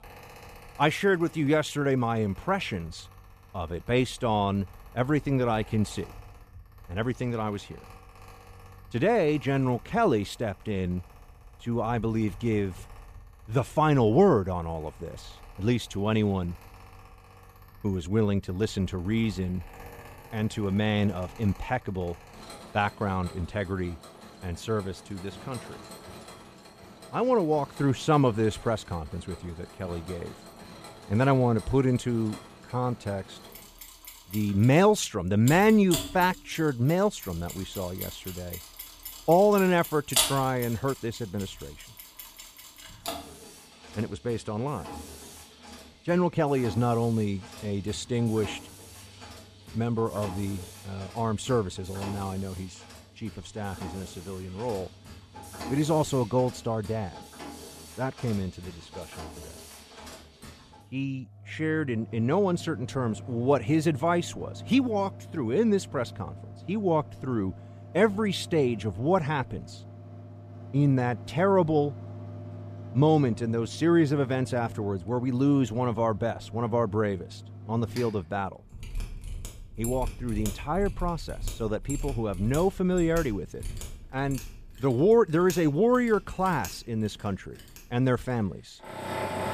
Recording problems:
machinery noise; noticeable; throughout; 15 dB below the speech

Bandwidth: 14.5 kHz